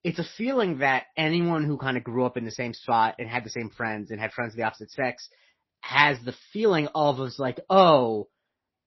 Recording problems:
garbled, watery; slightly; nothing above 5.5 kHz

